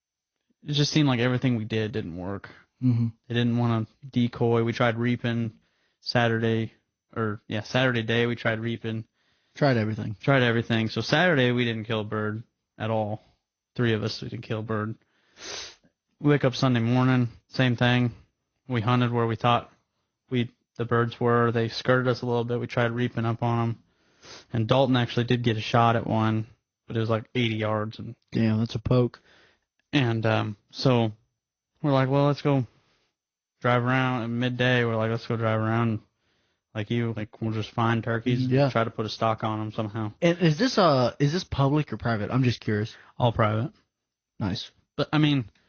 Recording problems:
garbled, watery; slightly; nothing above 6.5 kHz

